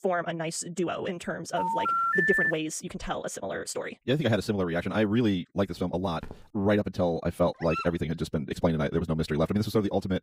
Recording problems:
wrong speed, natural pitch; too fast; 1.7 times normal speed
phone ringing; loud; at 1.5 s; peak 6 dB above the speech
footsteps; faint; at 6 s; peak 20 dB below the speech
dog barking; noticeable; at 7.5 s; peak 6 dB below the speech

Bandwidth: 15.5 kHz